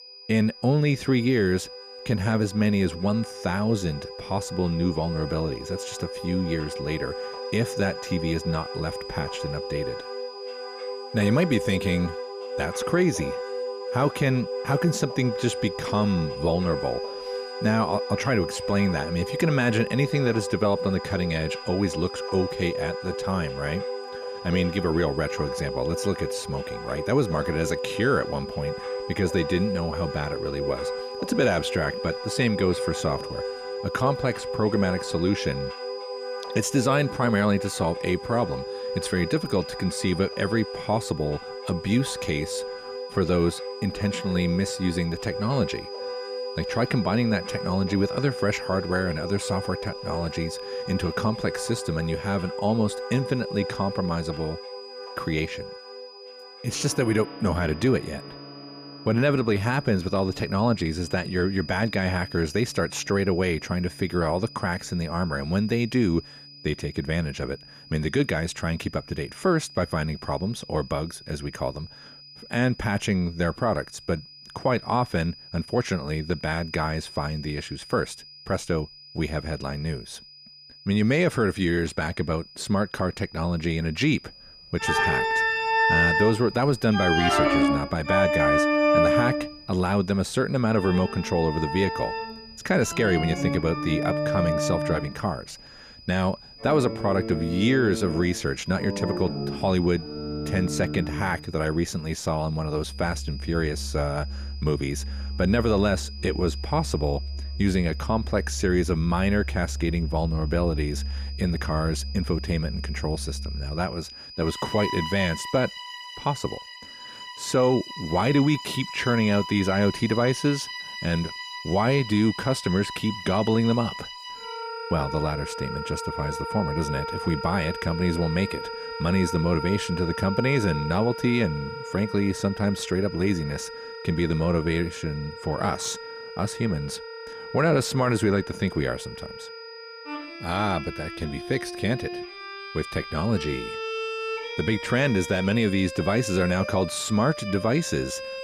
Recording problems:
background music; loud; throughout; 6 dB below the speech
high-pitched whine; noticeable; throughout; 5 kHz, 15 dB below the speech

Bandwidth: 15 kHz